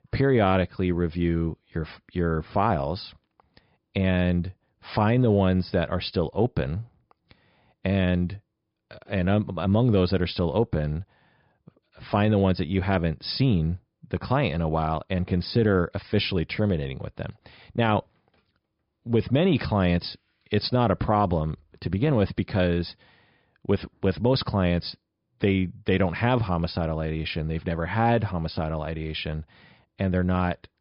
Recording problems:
high frequencies cut off; noticeable; nothing above 5.5 kHz

